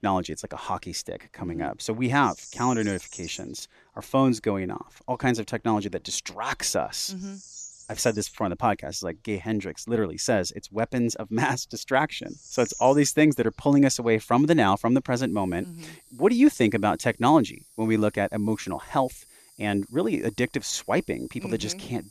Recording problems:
animal sounds; noticeable; throughout; 20 dB below the speech

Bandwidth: 13.5 kHz